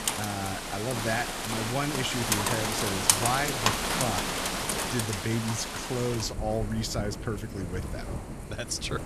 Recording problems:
rain or running water; very loud; throughout; 2 dB above the speech

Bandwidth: 14 kHz